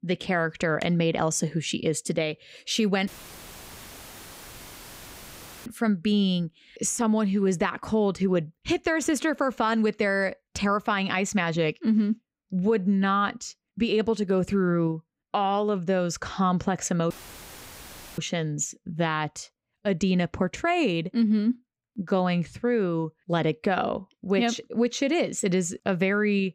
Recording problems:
audio cutting out; filled with static; at 3 s for 2.5 s and at 17 s for 1 s

